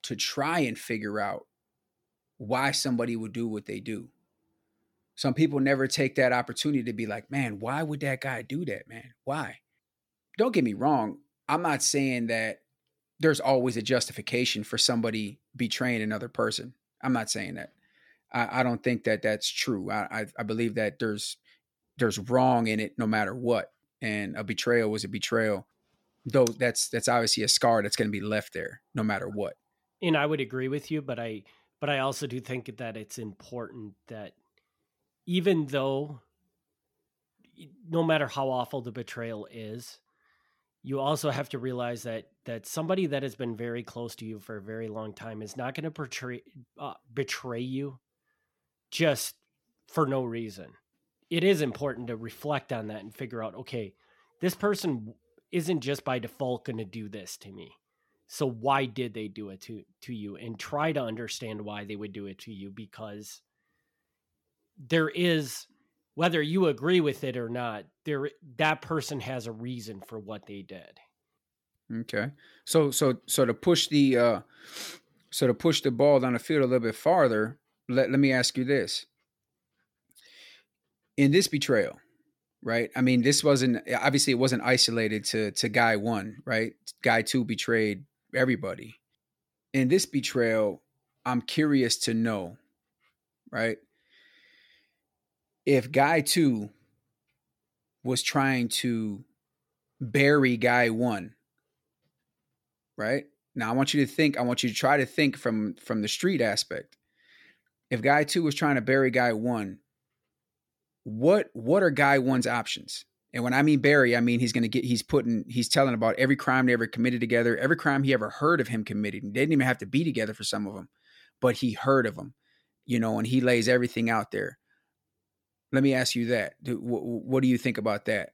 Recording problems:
none

